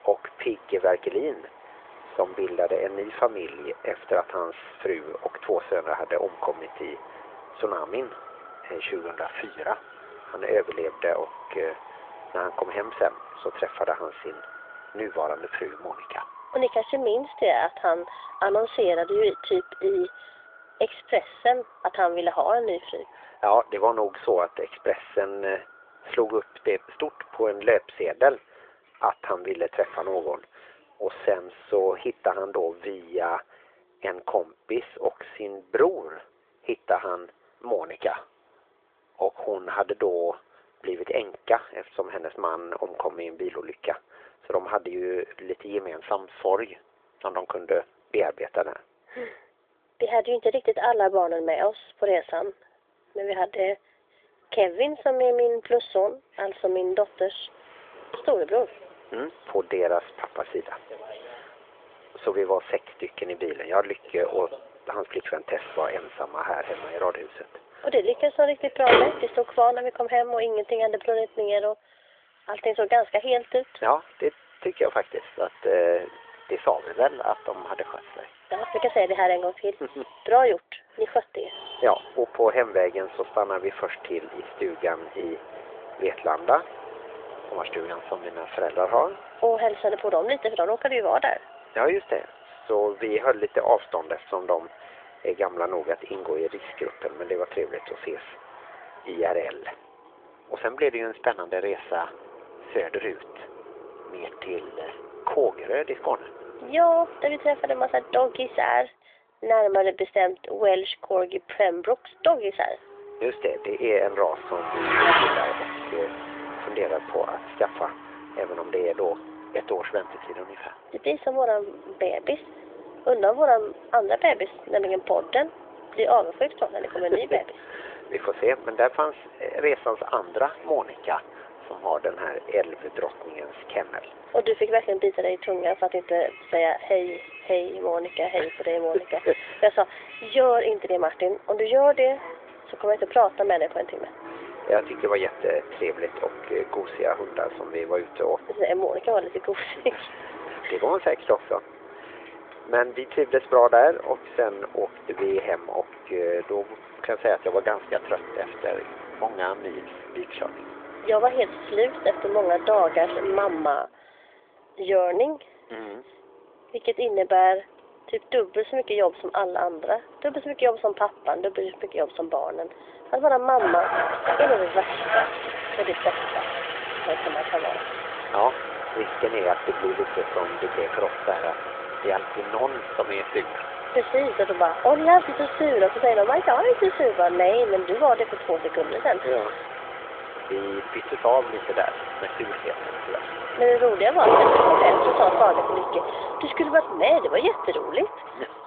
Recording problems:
phone-call audio; nothing above 3.5 kHz
traffic noise; loud; throughout; 6 dB below the speech

